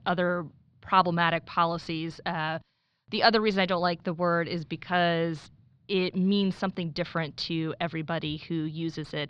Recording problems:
muffled; very slightly; fading above 4.5 kHz

